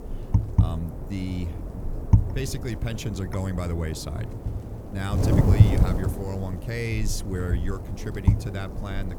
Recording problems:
wind noise on the microphone; heavy; 1 dB below the speech

